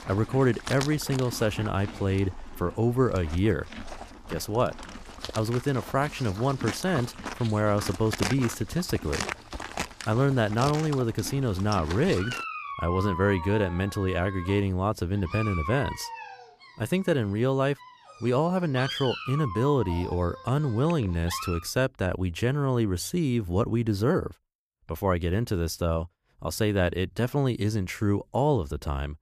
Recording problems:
animal sounds; noticeable; until 22 s; 10 dB below the speech

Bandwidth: 14.5 kHz